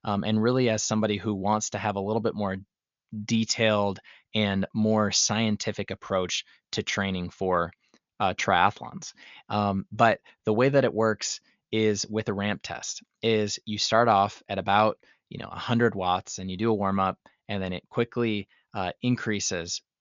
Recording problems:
high frequencies cut off; noticeable; nothing above 7 kHz

